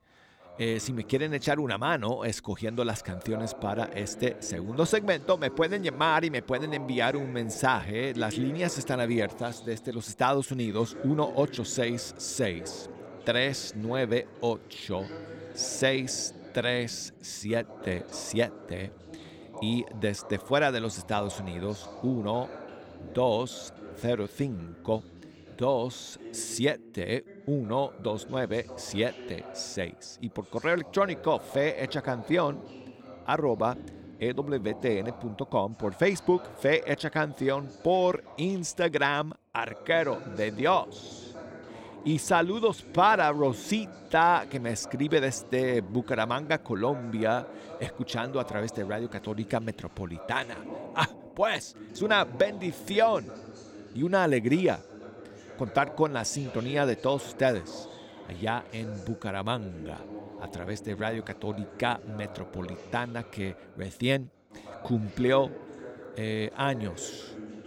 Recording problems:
voice in the background; noticeable; throughout; 15 dB below the speech

